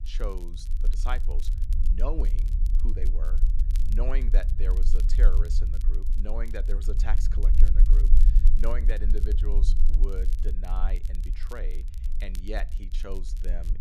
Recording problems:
low rumble; loud; throughout; 10 dB below the speech
crackle, like an old record; noticeable; 15 dB below the speech

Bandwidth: 14 kHz